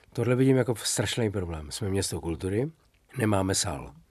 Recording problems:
none

